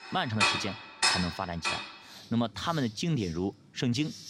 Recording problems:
household noises; very loud; throughout; 4 dB above the speech

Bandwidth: 16 kHz